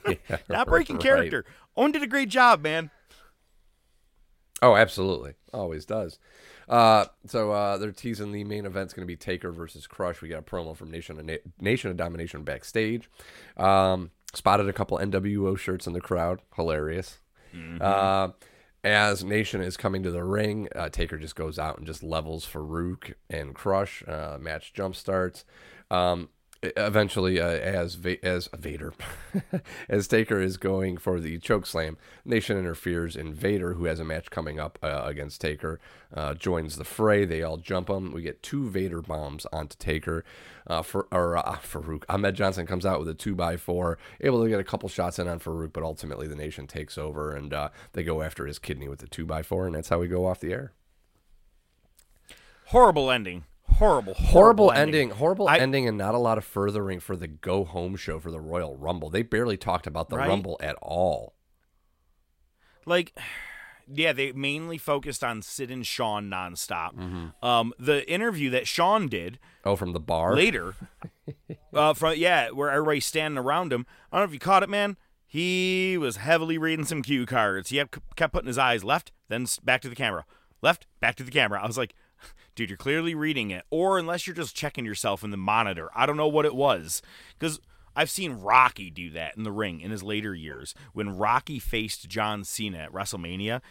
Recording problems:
none

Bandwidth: 16 kHz